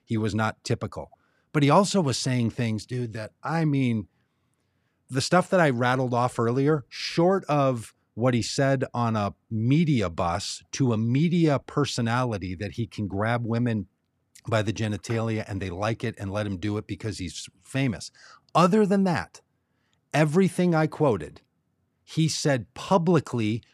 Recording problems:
none

